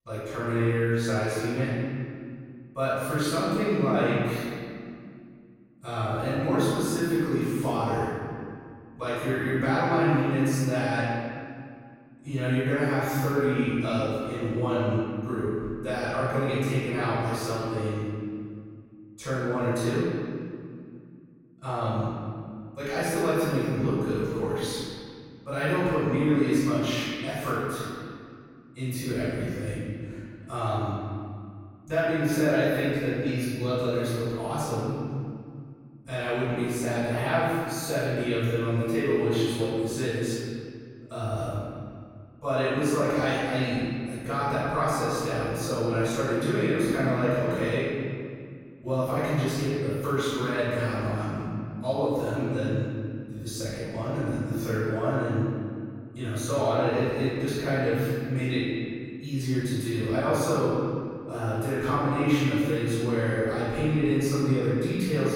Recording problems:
room echo; strong; dies away in 2.1 s
off-mic speech; far

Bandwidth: 16 kHz